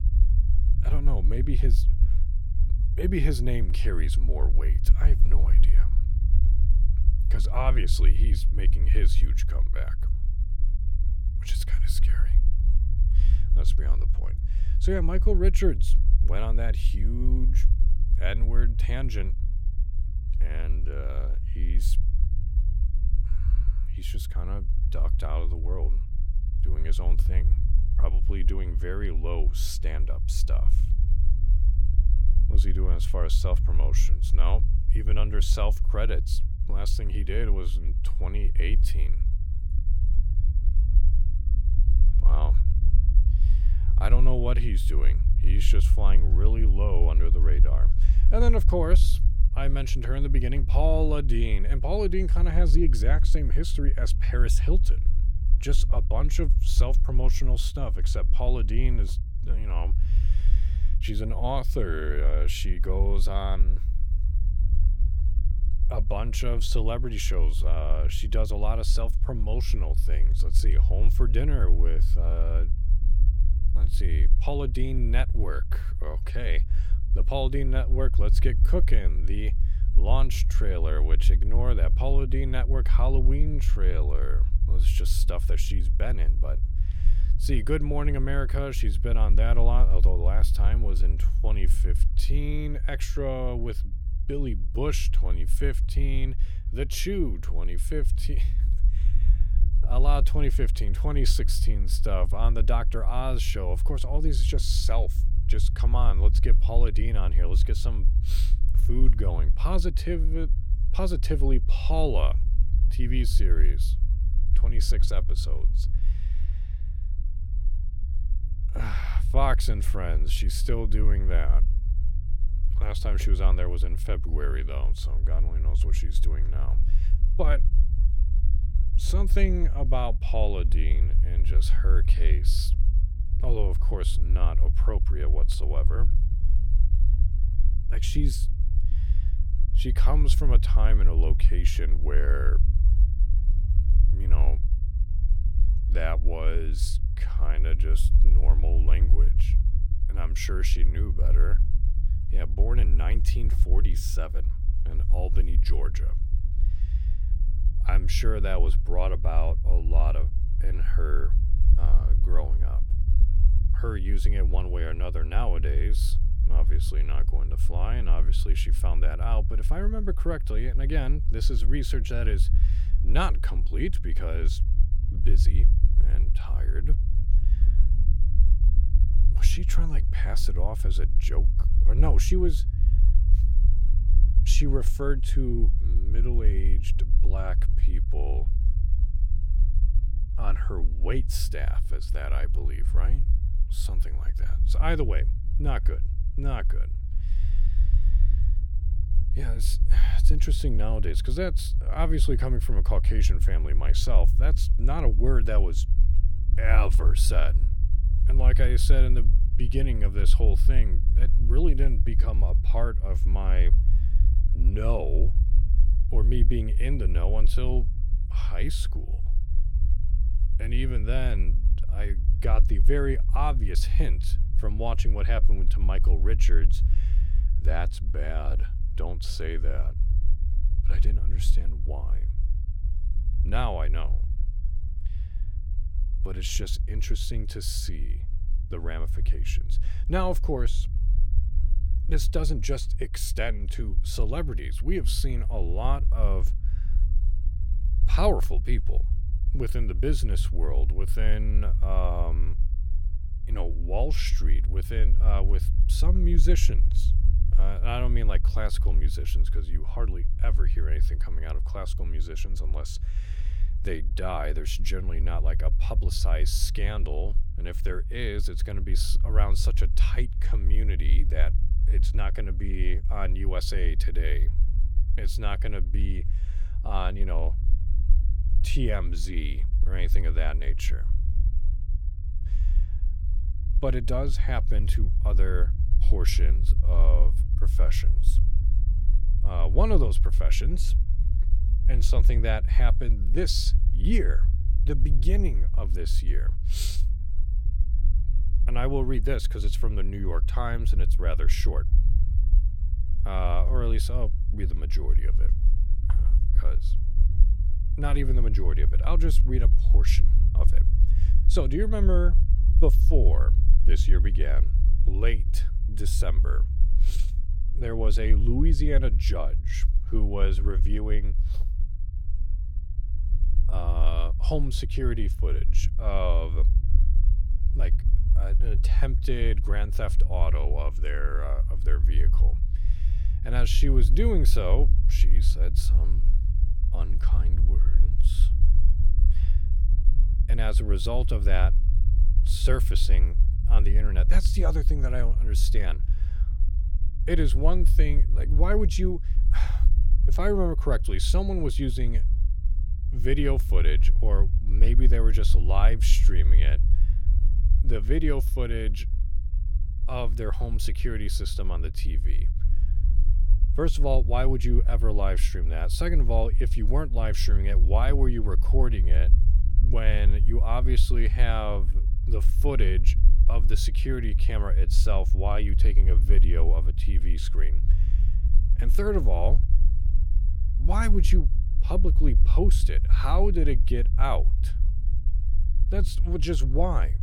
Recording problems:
low rumble; noticeable; throughout; 10 dB below the speech

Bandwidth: 17 kHz